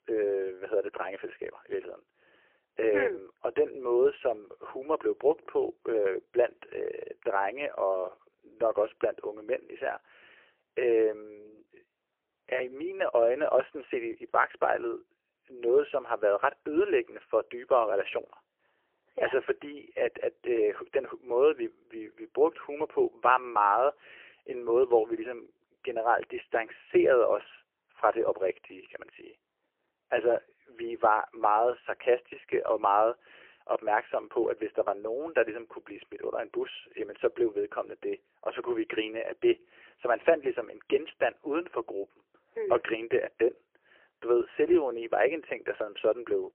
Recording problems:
phone-call audio; poor line; nothing above 3 kHz

